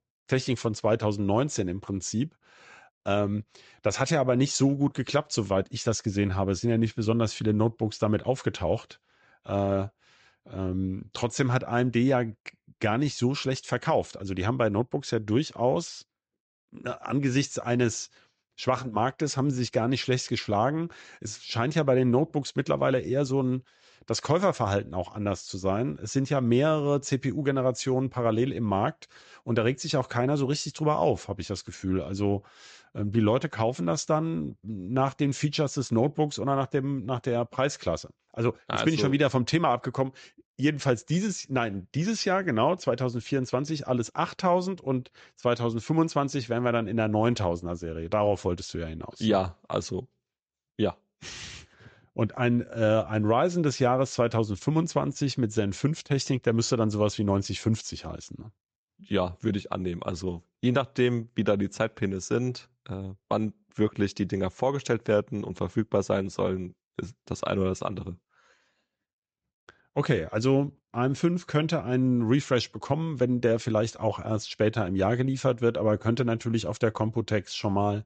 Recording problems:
high frequencies cut off; noticeable; nothing above 8 kHz

